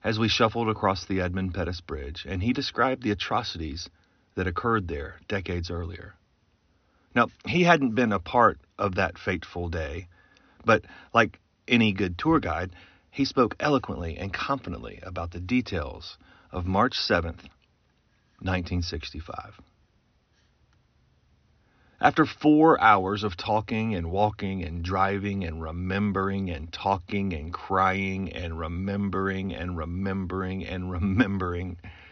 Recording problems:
high frequencies cut off; noticeable; nothing above 6 kHz

